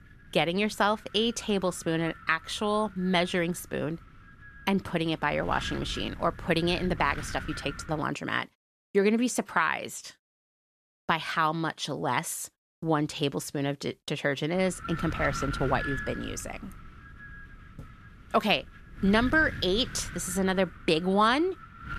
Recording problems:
wind noise on the microphone; occasional gusts; until 8 s and from 15 s on; 10 dB below the speech

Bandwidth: 13.5 kHz